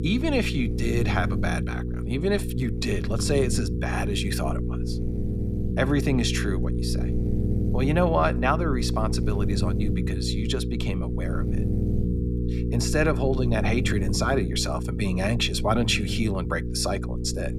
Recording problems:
electrical hum; loud; throughout; 60 Hz, 8 dB below the speech

